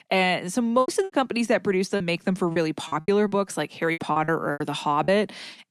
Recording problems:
choppy; very; from 1 to 3.5 s and from 4 to 5 s; 16% of the speech affected

